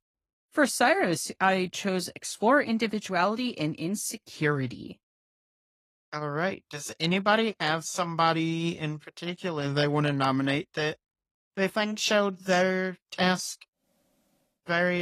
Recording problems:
garbled, watery; slightly; nothing above 12.5 kHz
abrupt cut into speech; at the end

